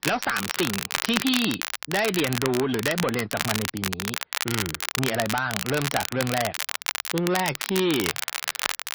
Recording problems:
distortion; slight; 10 dB below the speech
garbled, watery; slightly; nothing above 5.5 kHz
crackle, like an old record; loud; 2 dB below the speech

